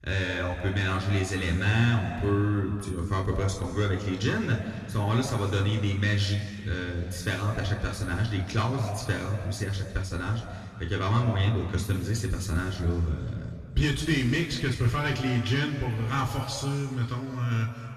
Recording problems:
off-mic speech; far
room echo; noticeable; dies away in 2.1 s

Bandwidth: 13.5 kHz